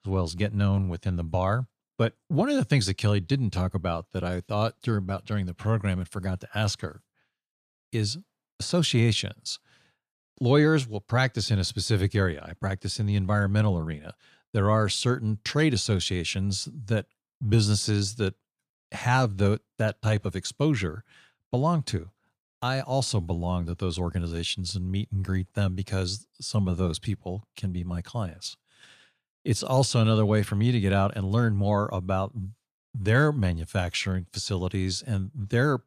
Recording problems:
none

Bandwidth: 14.5 kHz